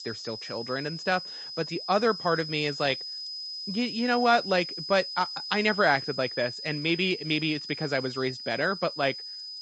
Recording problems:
garbled, watery; slightly; nothing above 7.5 kHz
high-pitched whine; loud; throughout; 5 kHz, 8 dB below the speech

